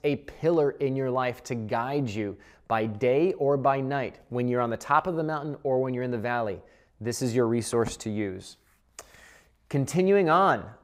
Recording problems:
none

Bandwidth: 15.5 kHz